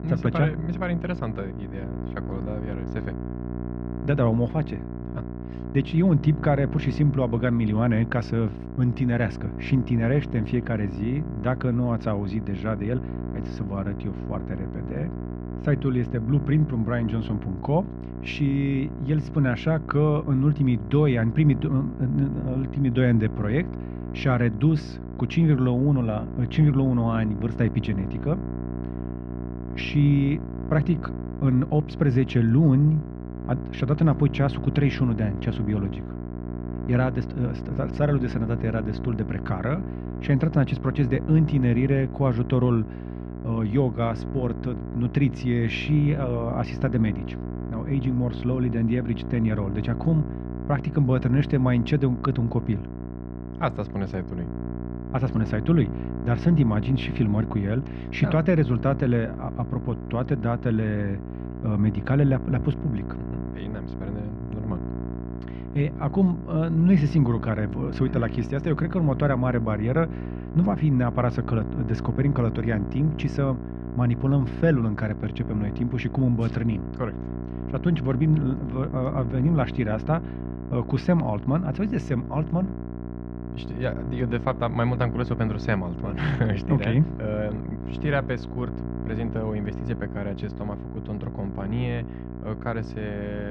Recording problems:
muffled; very; fading above 3 kHz
electrical hum; loud; throughout; 60 Hz, 10 dB below the speech
abrupt cut into speech; at the end

